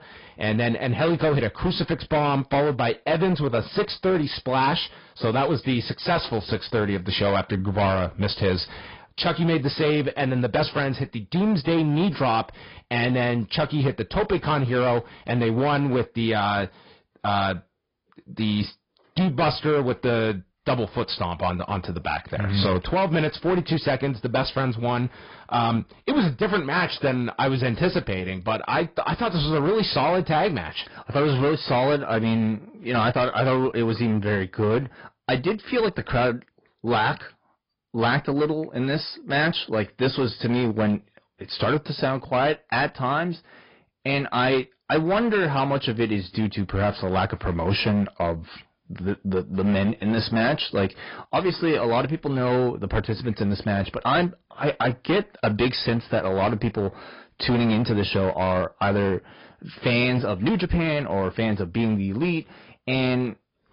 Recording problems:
high frequencies cut off; noticeable; nothing above 5 kHz
distortion; slight; 11% of the sound clipped
garbled, watery; slightly

